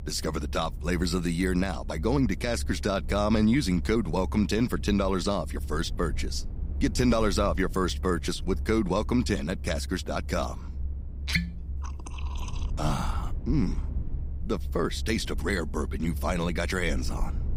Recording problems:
low rumble; faint; throughout; 20 dB below the speech

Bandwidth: 15.5 kHz